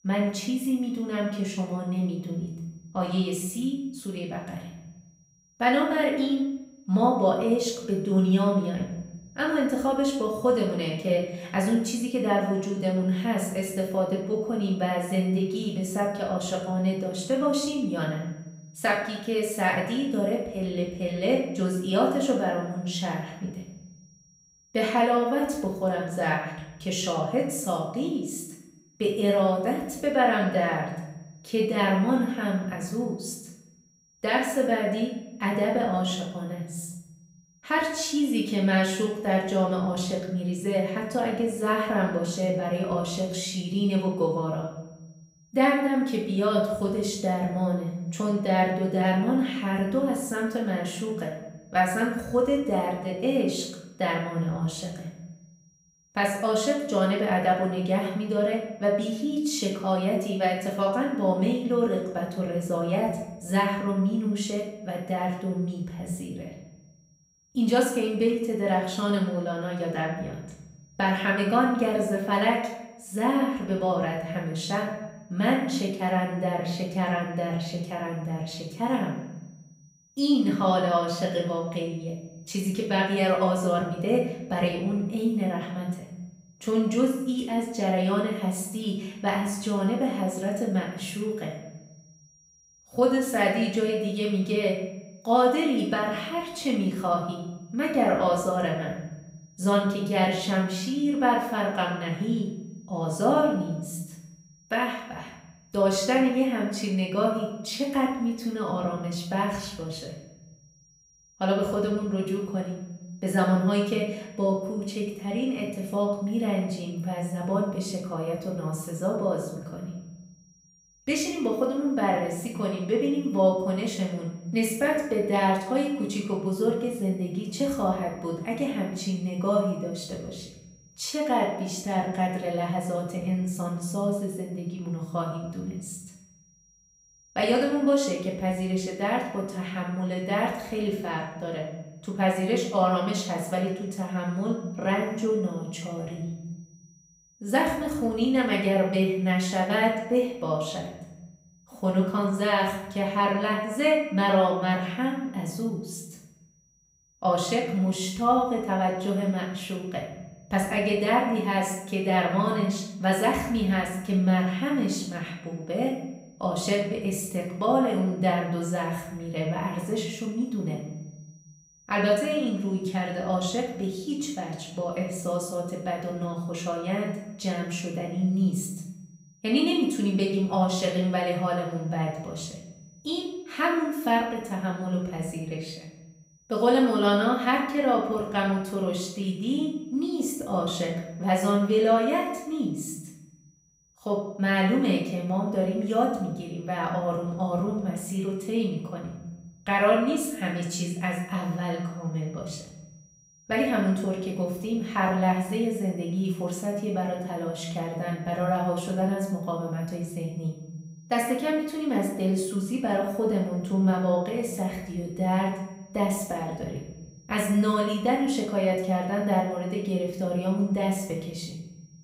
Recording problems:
off-mic speech; far
room echo; noticeable; dies away in 0.8 s
high-pitched whine; faint; throughout; 5.5 kHz, 30 dB below the speech

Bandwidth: 15.5 kHz